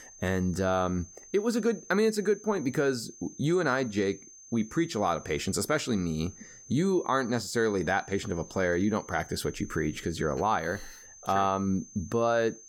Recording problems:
high-pitched whine; noticeable; throughout; 6.5 kHz, 20 dB below the speech

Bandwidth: 17.5 kHz